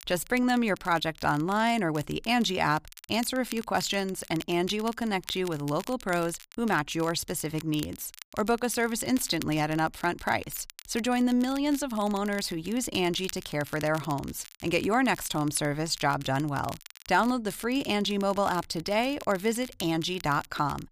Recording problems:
crackle, like an old record; noticeable; 20 dB below the speech

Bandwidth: 15 kHz